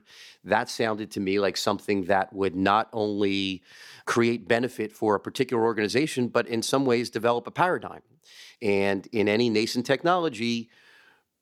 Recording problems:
none

